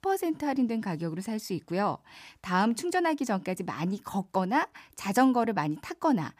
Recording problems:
none

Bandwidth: 15 kHz